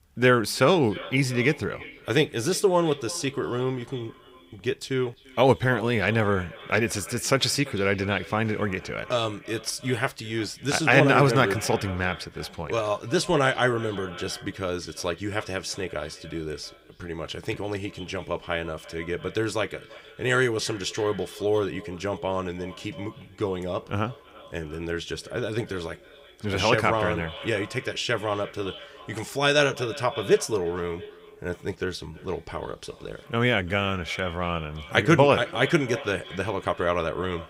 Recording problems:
echo of what is said; noticeable; throughout; 340 ms later, 15 dB below the speech

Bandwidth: 15.5 kHz